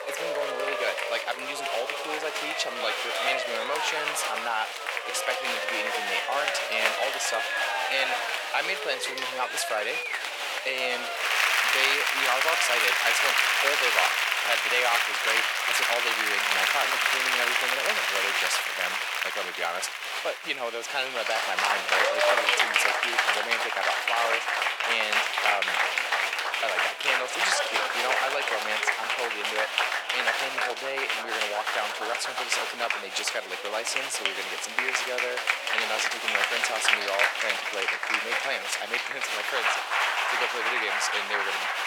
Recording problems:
thin; very; fading below 500 Hz
crowd noise; very loud; throughout; 6 dB above the speech

